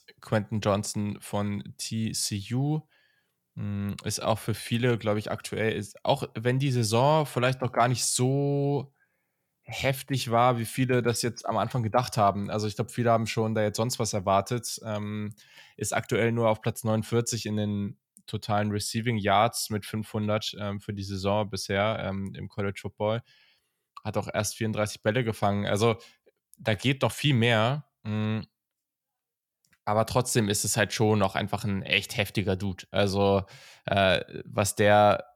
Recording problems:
none

